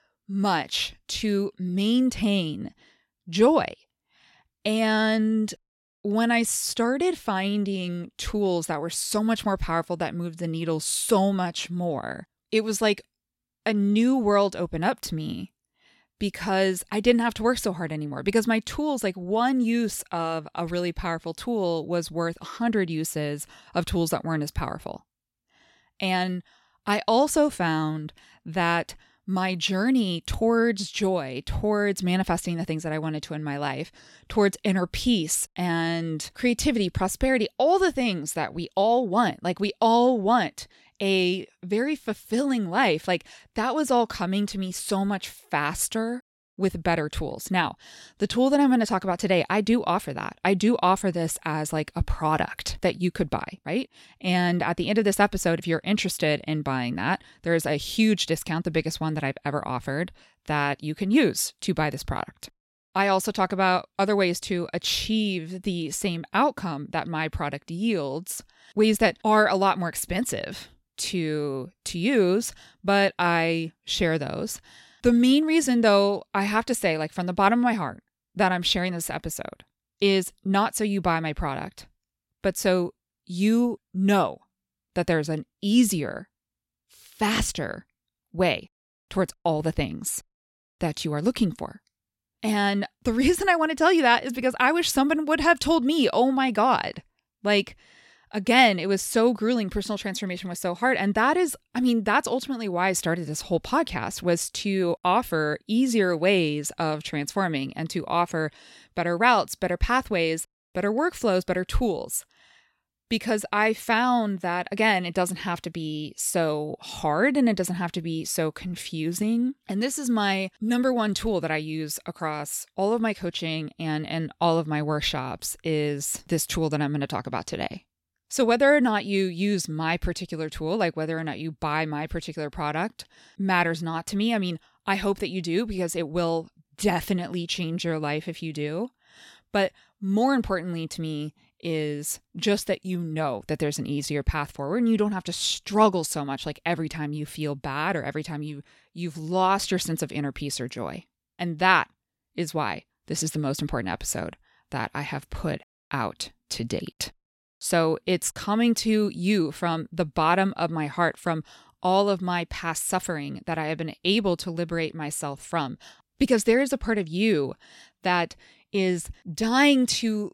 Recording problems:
none

